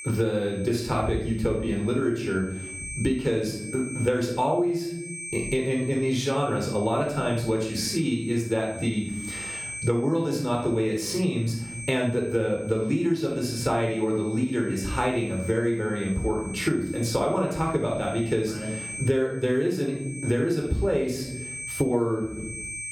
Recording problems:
room echo; noticeable; dies away in 0.5 s
off-mic speech; somewhat distant
squashed, flat; somewhat
high-pitched whine; noticeable; throughout; 2.5 kHz, 15 dB below the speech

